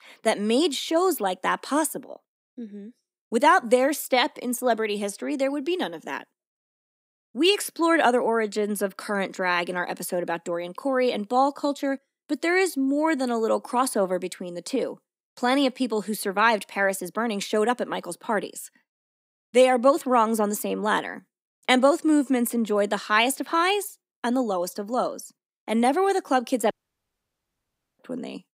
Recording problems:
audio cutting out; at 27 s for 1.5 s

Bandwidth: 15.5 kHz